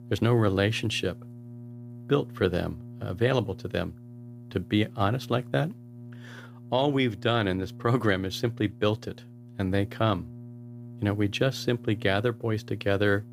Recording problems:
electrical hum; faint; throughout; 60 Hz, 25 dB below the speech

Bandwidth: 15.5 kHz